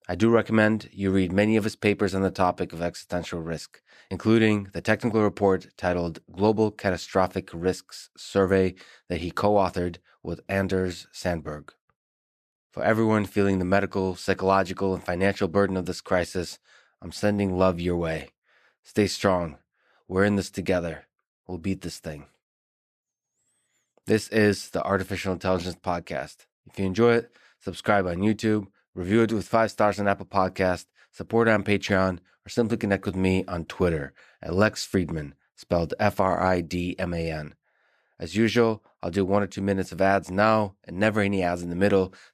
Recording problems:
none

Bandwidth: 14.5 kHz